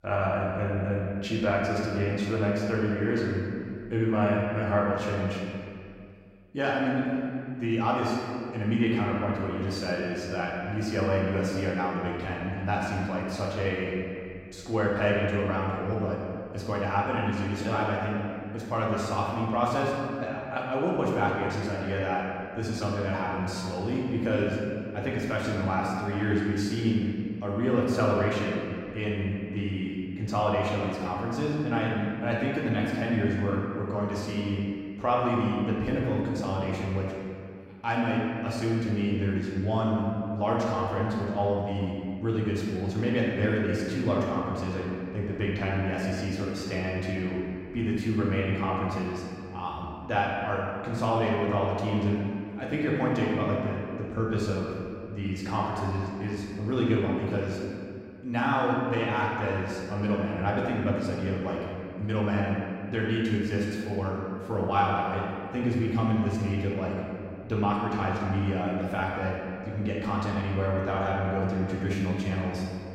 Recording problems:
off-mic speech; far
room echo; noticeable; dies away in 2.1 s

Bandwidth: 16 kHz